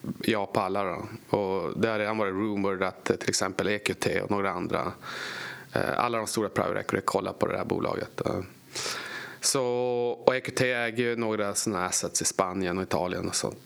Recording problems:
squashed, flat; heavily

